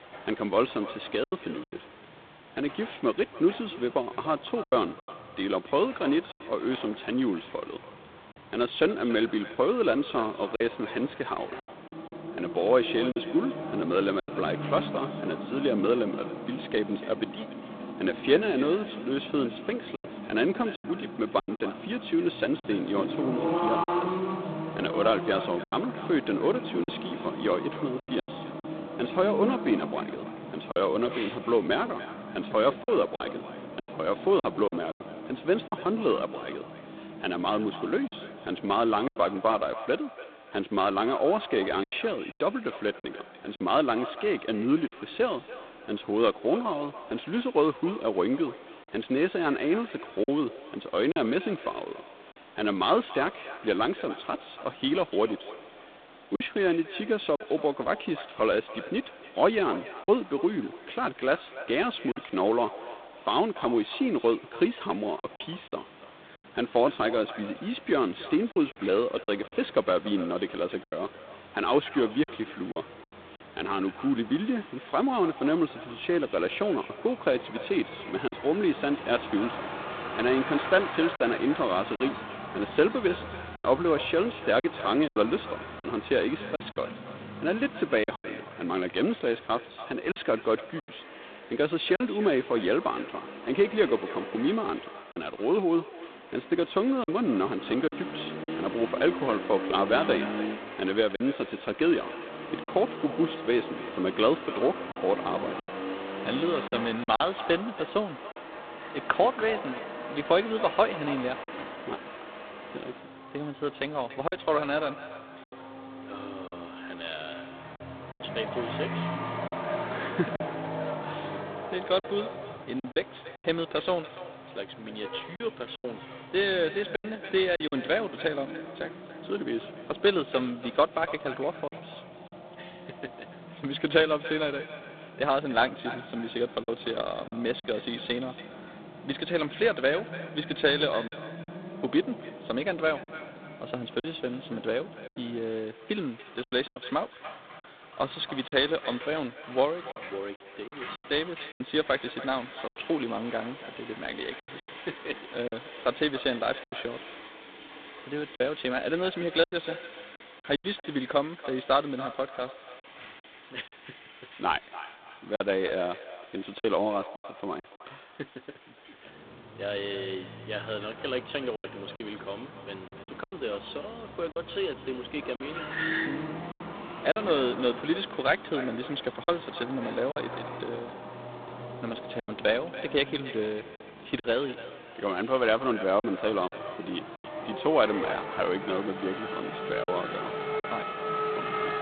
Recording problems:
phone-call audio; poor line; nothing above 3.5 kHz
echo of what is said; noticeable; throughout; 290 ms later, 15 dB below the speech
traffic noise; noticeable; throughout; 10 dB below the speech
hiss; faint; throughout; 25 dB below the speech
choppy; occasionally; 4% of the speech affected

